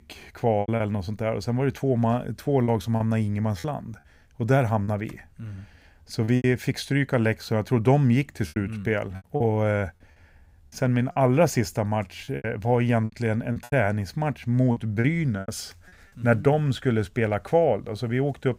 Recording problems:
choppy; very; 7% of the speech affected

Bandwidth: 15.5 kHz